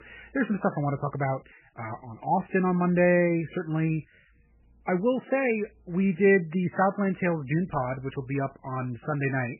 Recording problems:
garbled, watery; badly; nothing above 2.5 kHz

